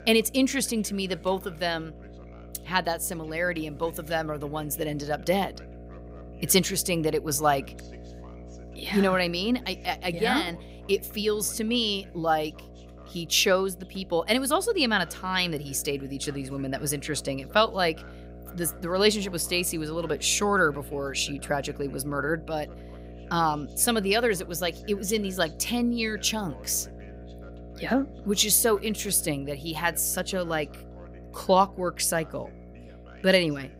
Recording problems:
electrical hum; faint; throughout; 60 Hz, 25 dB below the speech
voice in the background; faint; throughout; 25 dB below the speech

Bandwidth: 15.5 kHz